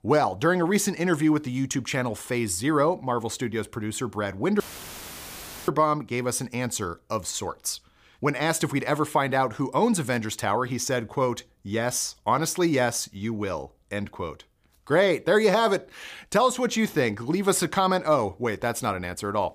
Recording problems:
audio cutting out; filled with static; at 4.5 s for 1 s

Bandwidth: 15 kHz